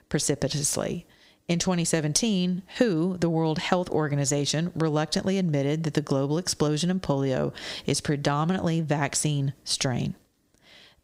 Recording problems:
squashed, flat; somewhat

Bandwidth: 15.5 kHz